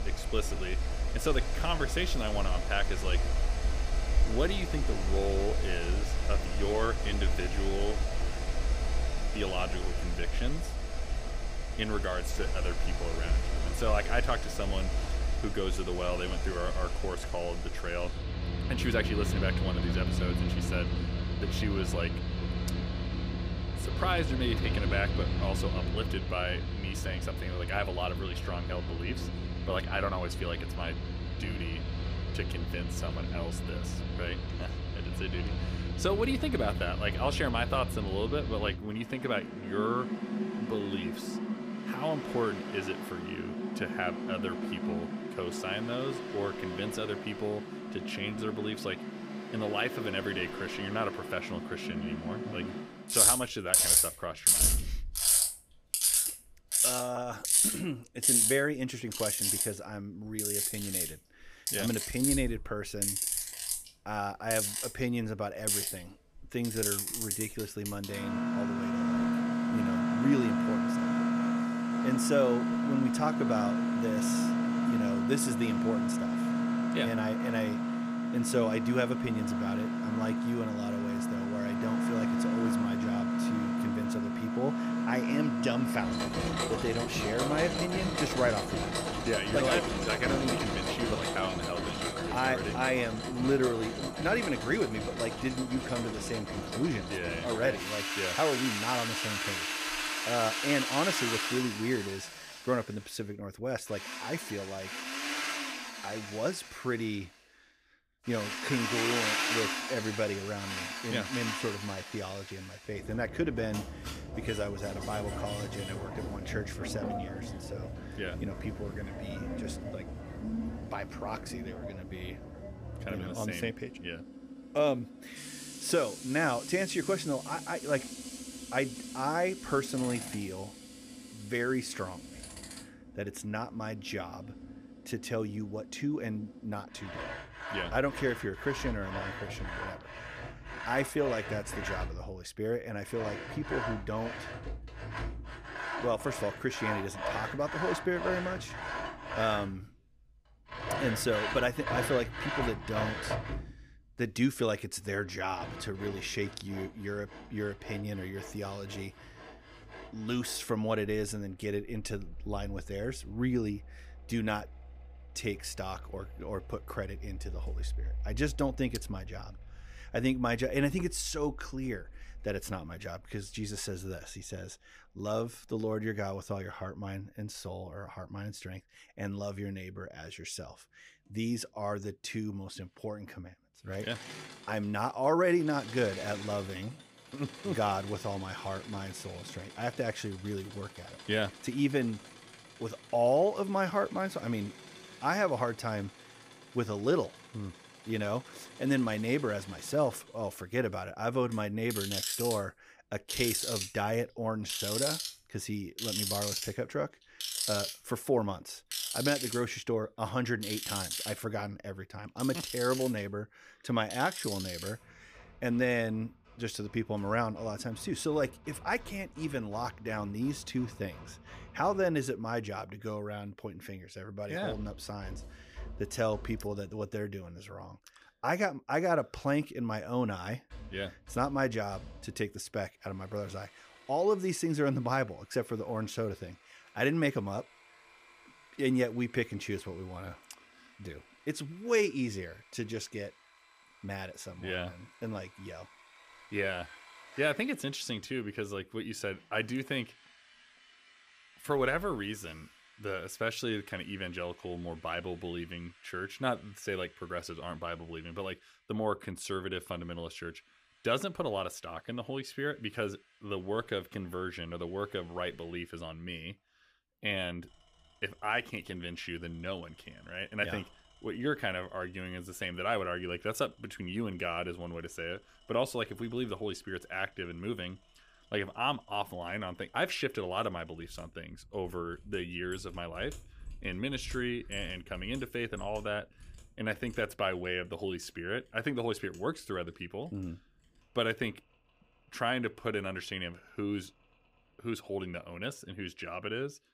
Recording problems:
machinery noise; very loud; throughout; 1 dB above the speech

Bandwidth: 15 kHz